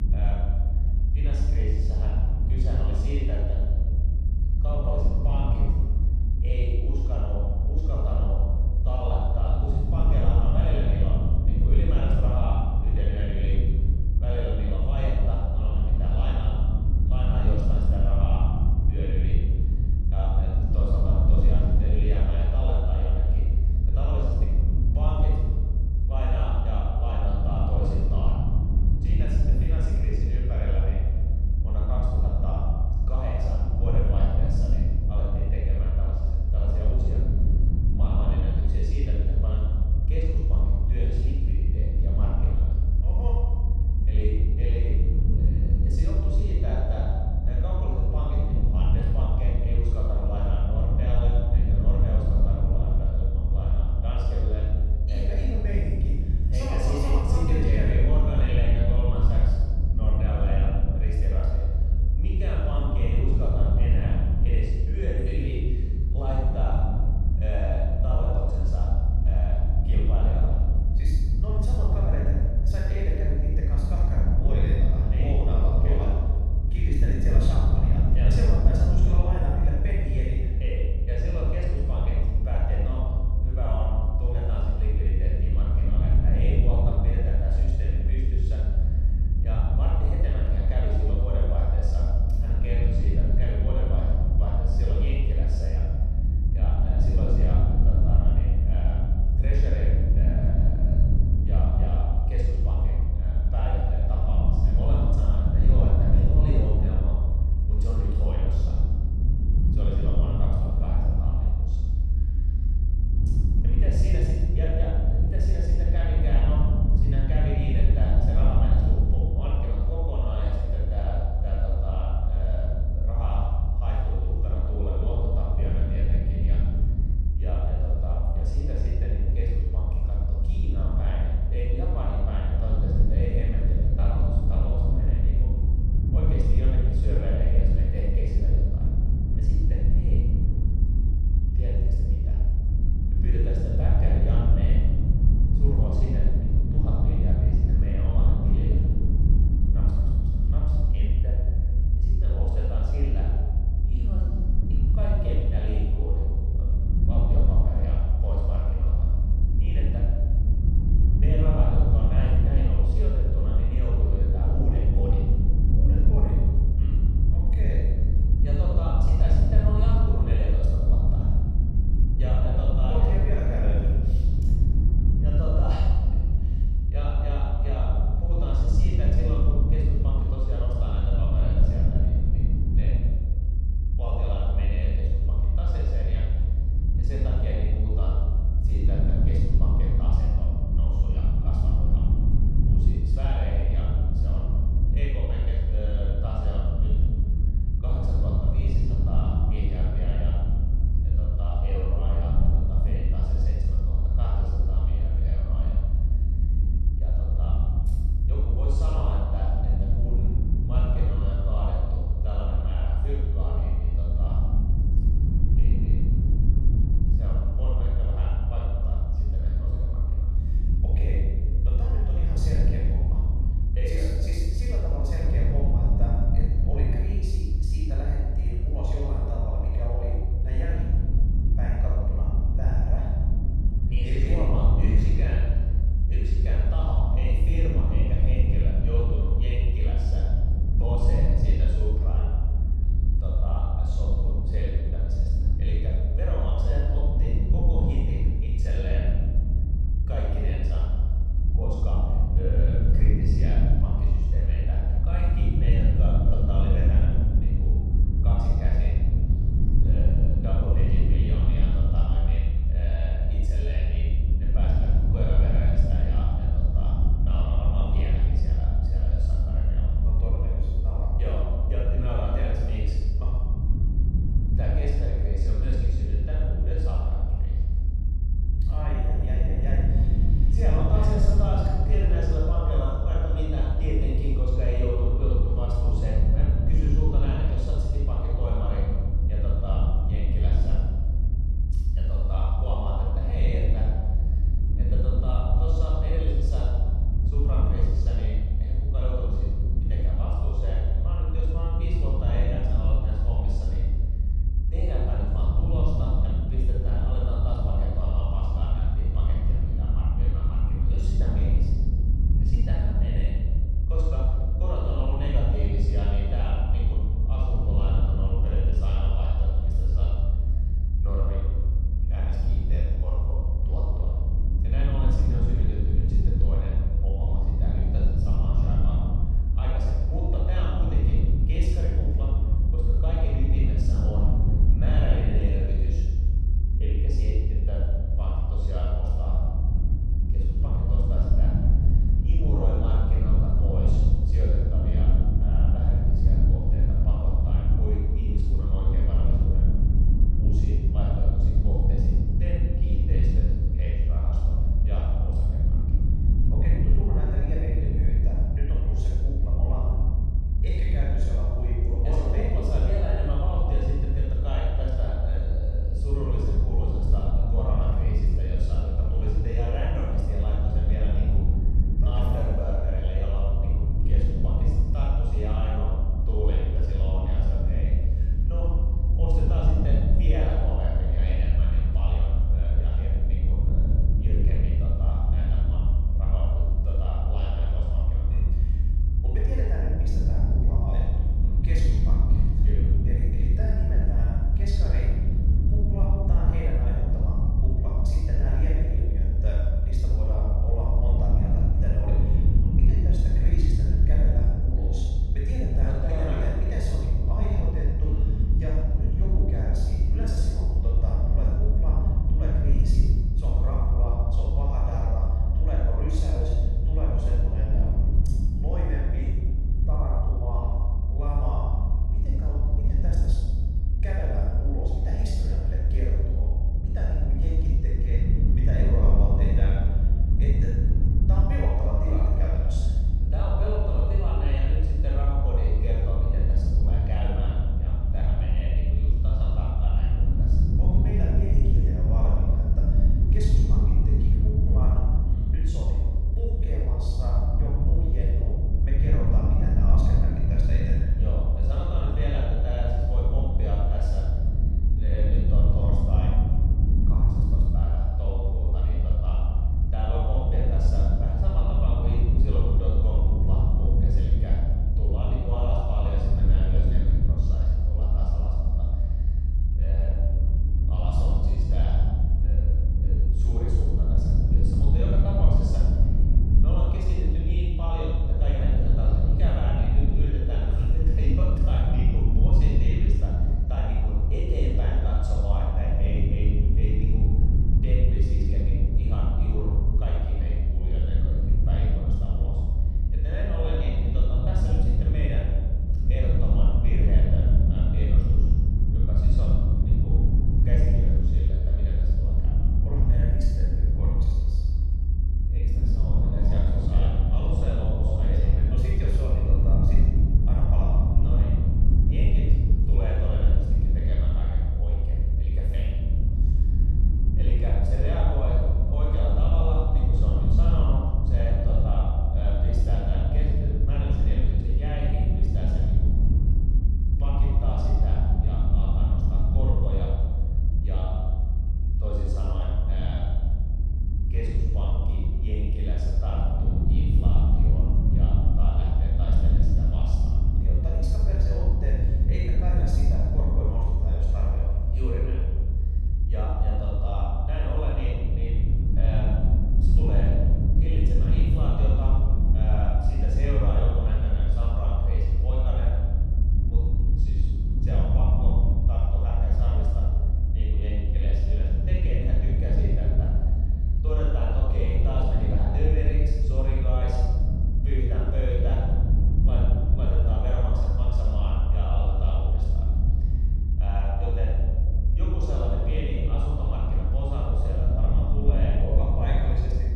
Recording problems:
room echo; strong; dies away in 1.7 s
off-mic speech; far
low rumble; loud; throughout; 3 dB below the speech

